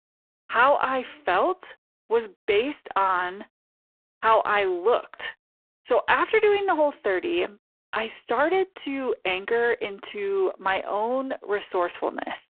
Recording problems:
phone-call audio; poor line

